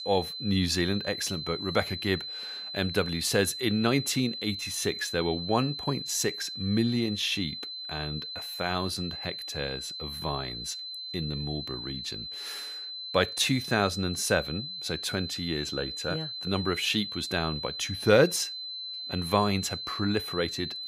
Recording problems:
high-pitched whine; loud; throughout; 4 kHz, 6 dB below the speech

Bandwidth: 15.5 kHz